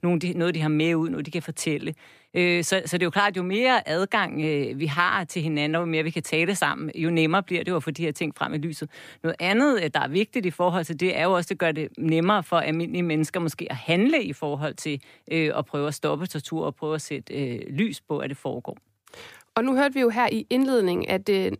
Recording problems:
none

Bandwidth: 15 kHz